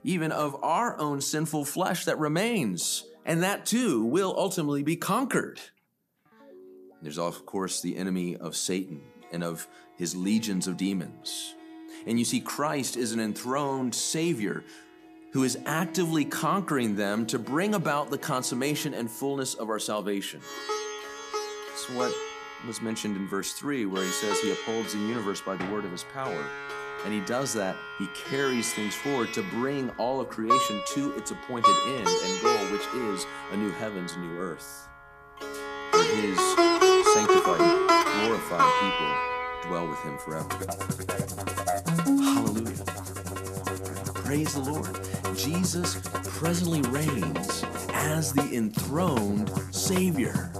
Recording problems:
background music; very loud; throughout; 1 dB above the speech

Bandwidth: 14.5 kHz